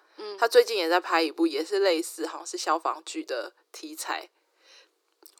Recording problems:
thin; very; fading below 300 Hz

